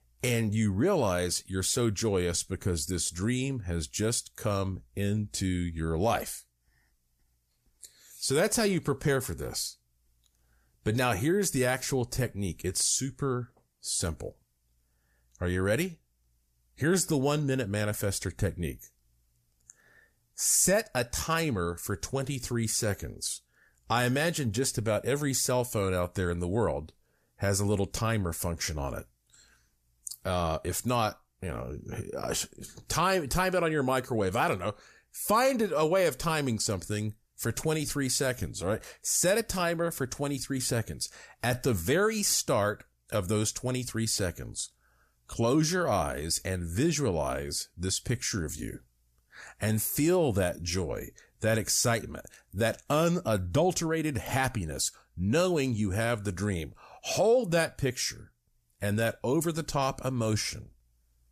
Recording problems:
none

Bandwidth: 14.5 kHz